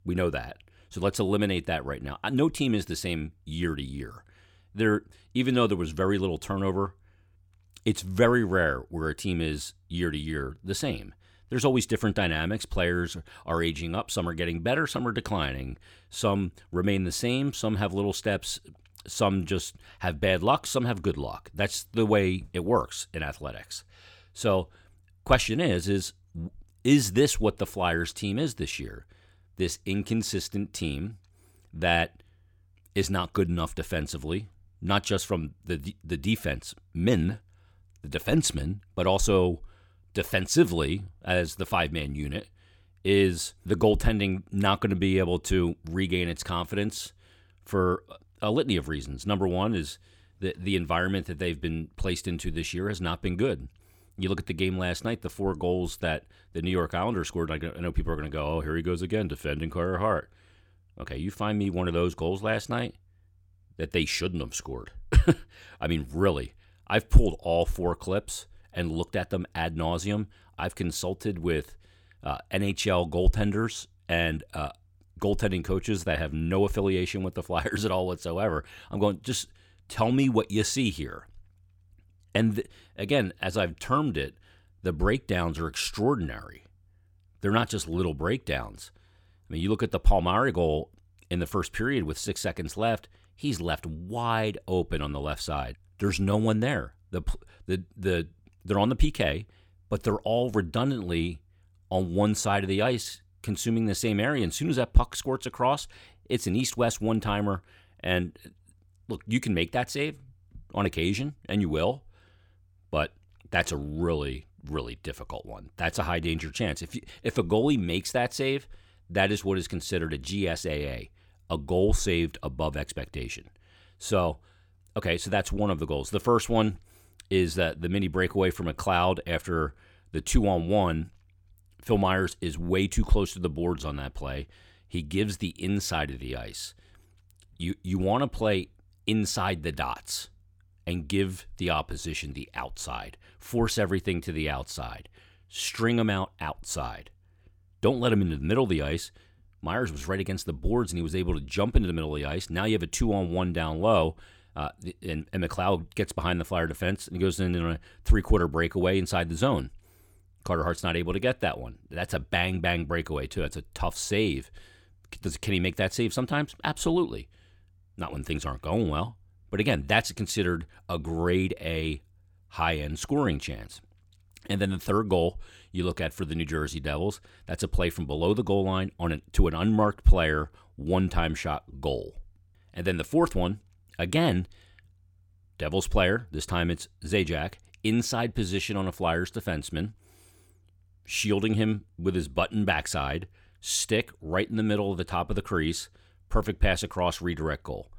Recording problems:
none

